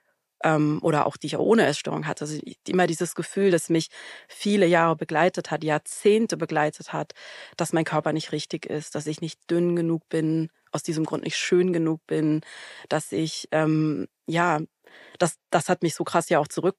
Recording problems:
none

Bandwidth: 14.5 kHz